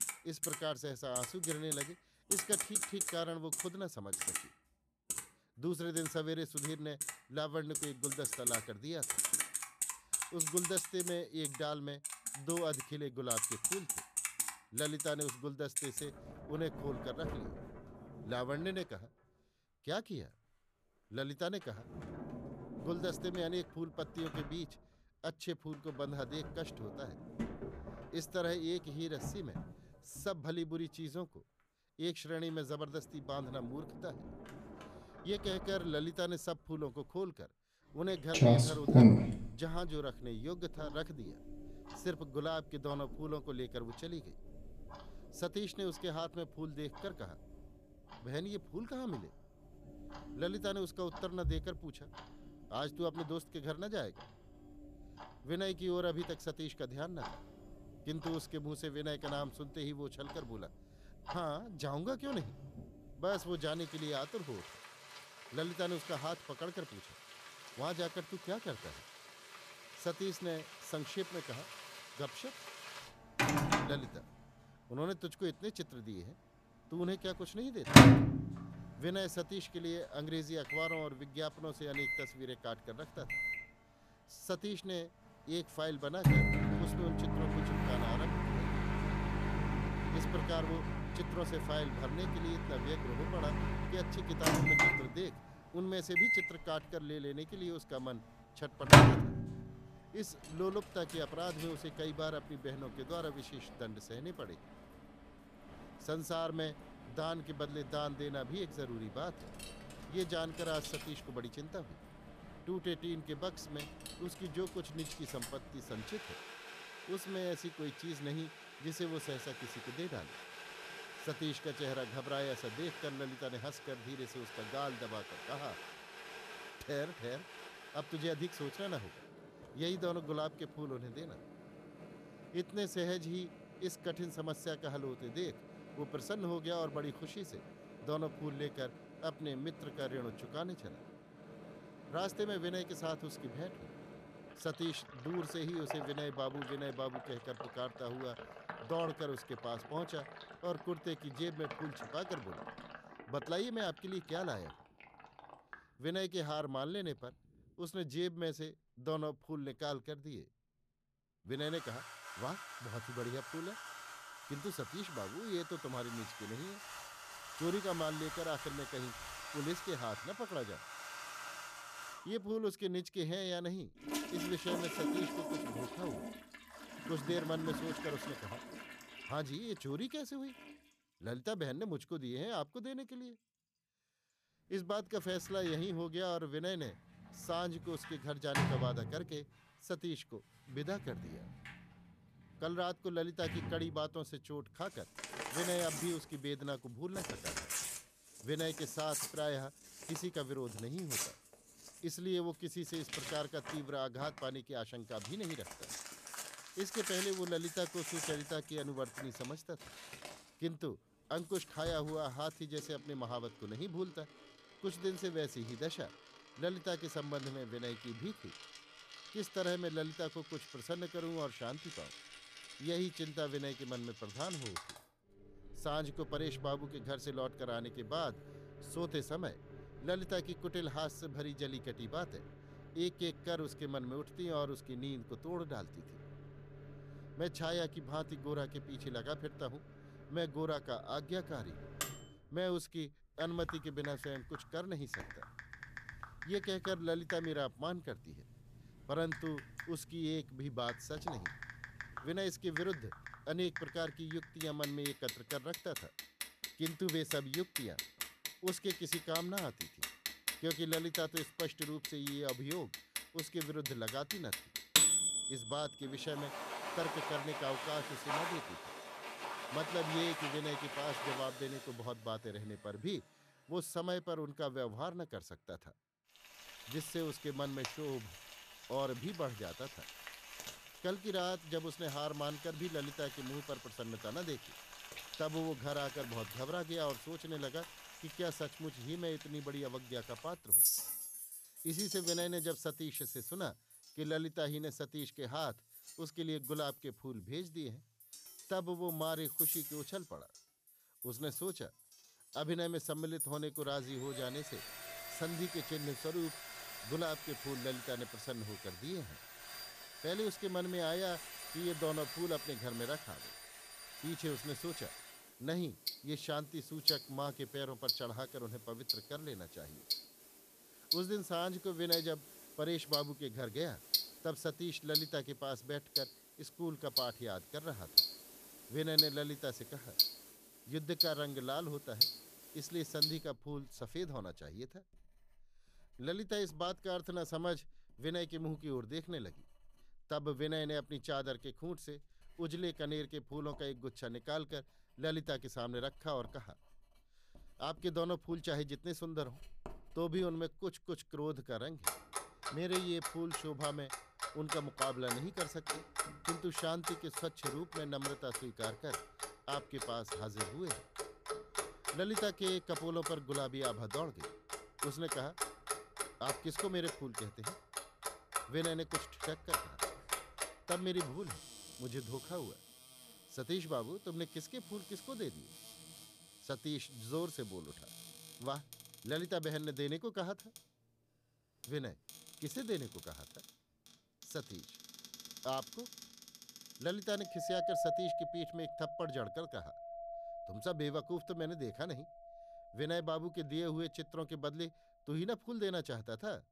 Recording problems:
household noises; very loud; throughout; 4 dB above the speech

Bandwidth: 14.5 kHz